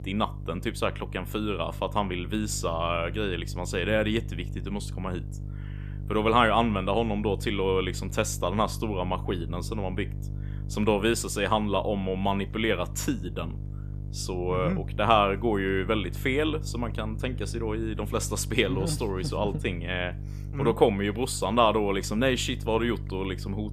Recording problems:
electrical hum; faint; throughout; 50 Hz, 20 dB below the speech

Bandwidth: 14.5 kHz